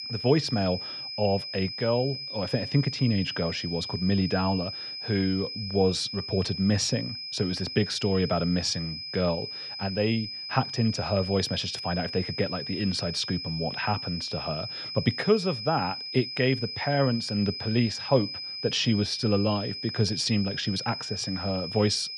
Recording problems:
high-pitched whine; loud; throughout; 5 kHz, 6 dB below the speech

